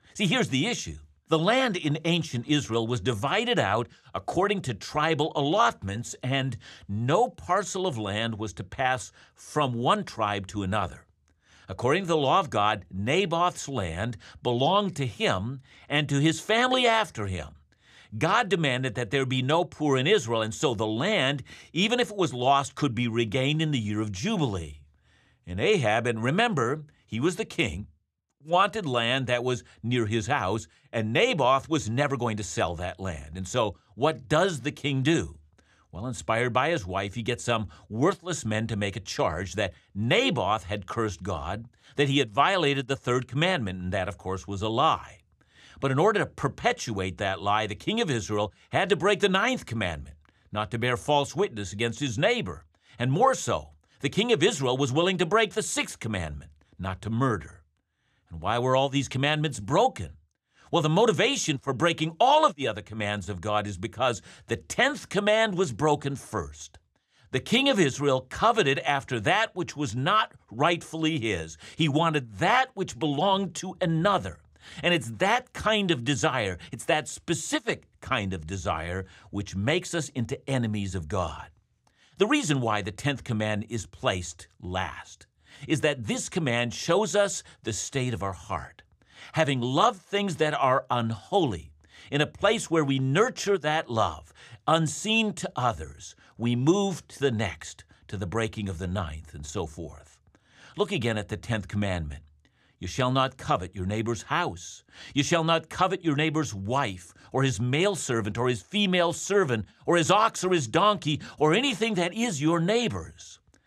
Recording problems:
none

